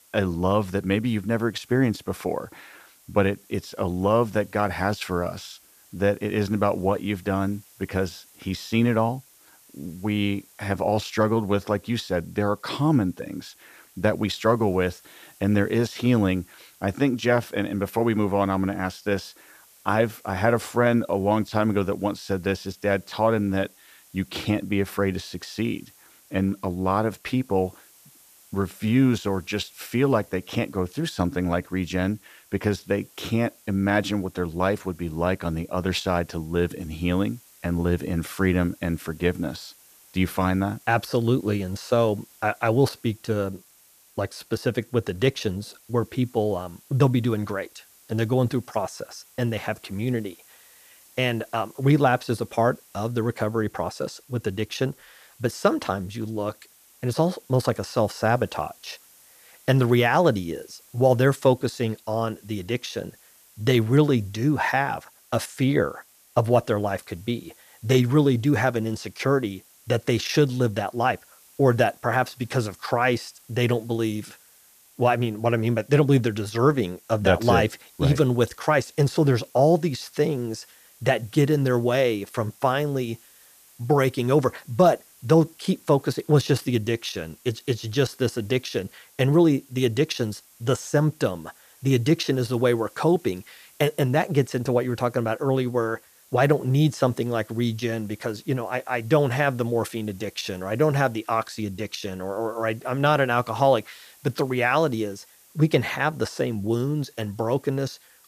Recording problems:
hiss; faint; throughout; 25 dB below the speech

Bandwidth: 14.5 kHz